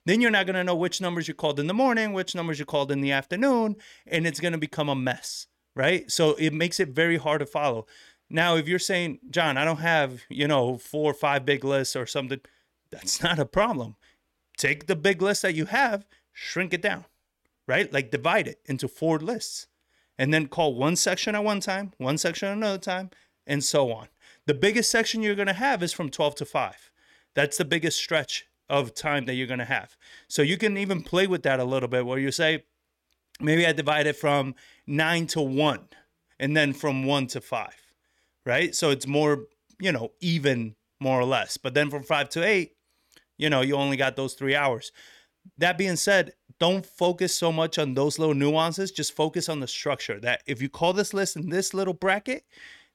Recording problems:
none

